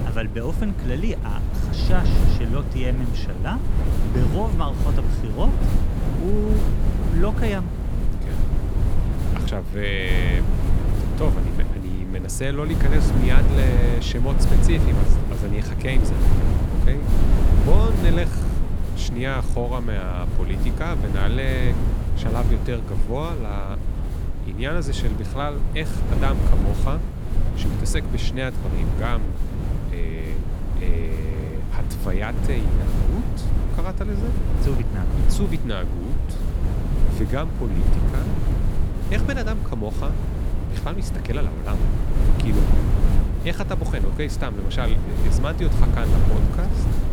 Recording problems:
wind noise on the microphone; heavy; 3 dB below the speech

